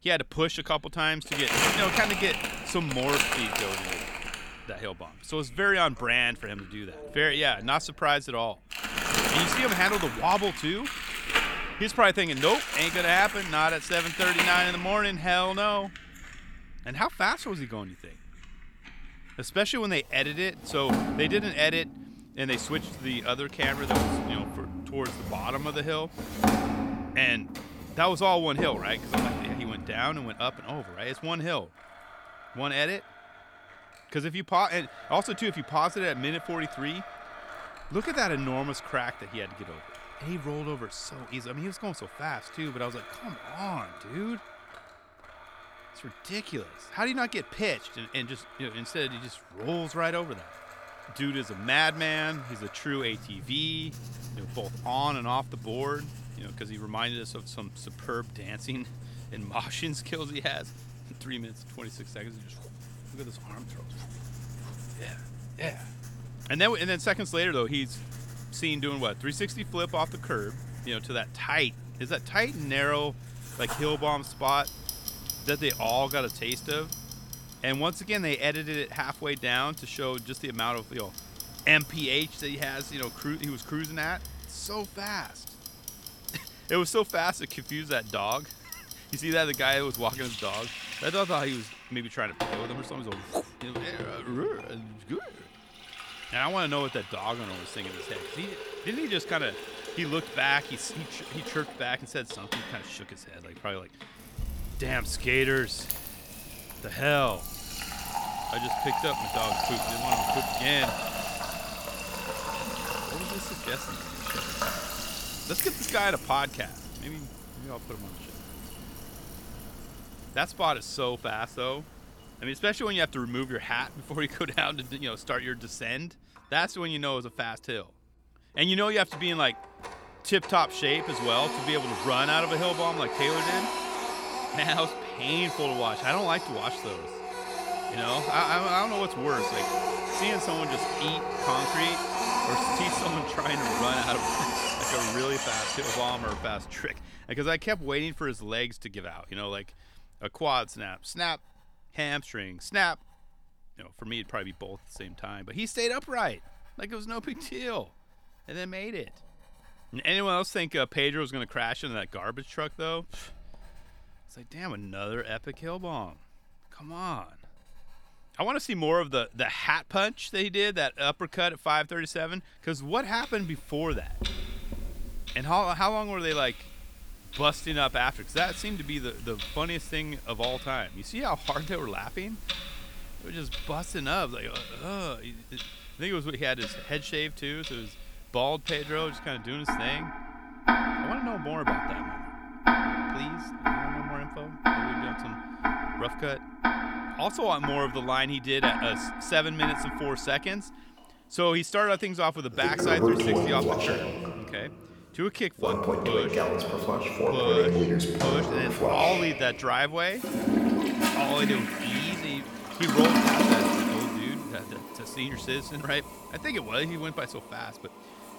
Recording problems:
household noises; loud; throughout; 3 dB below the speech

